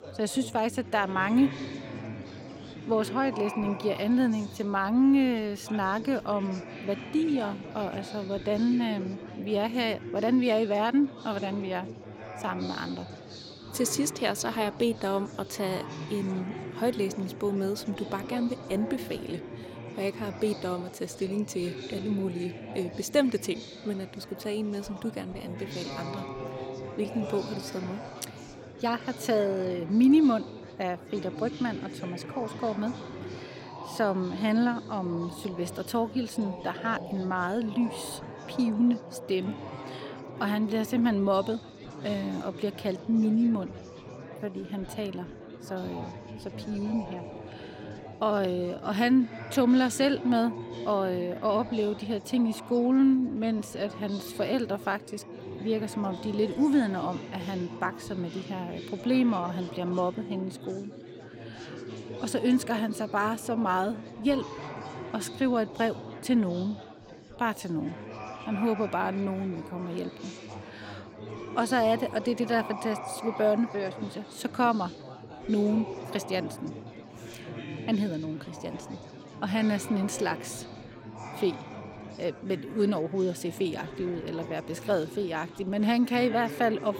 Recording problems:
chatter from many people; noticeable; throughout; 10 dB below the speech

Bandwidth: 16.5 kHz